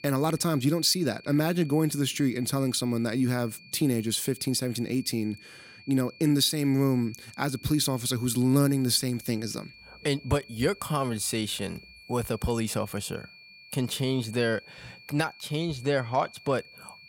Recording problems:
high-pitched whine; faint; throughout; 2.5 kHz, 20 dB below the speech

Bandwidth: 16.5 kHz